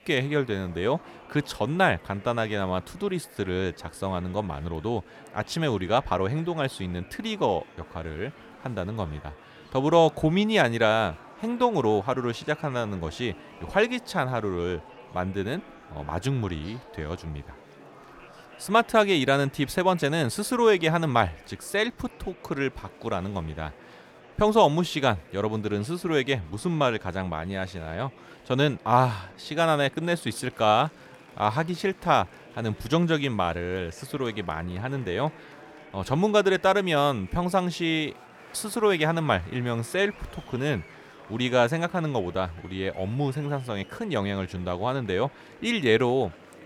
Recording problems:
murmuring crowd; faint; throughout; 20 dB below the speech

